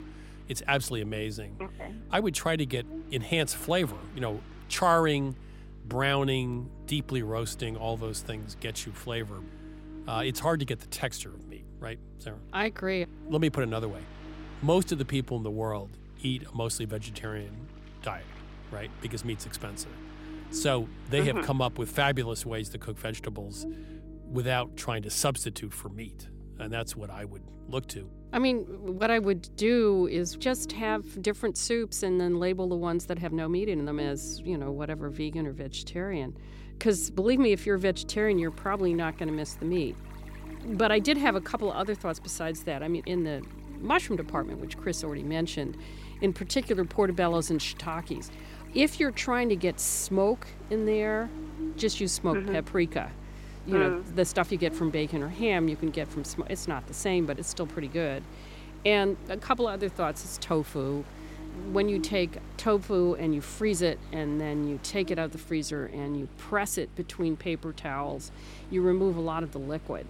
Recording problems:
electrical hum; faint; throughout; 50 Hz, 20 dB below the speech
rain or running water; faint; throughout; 25 dB below the speech

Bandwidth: 16 kHz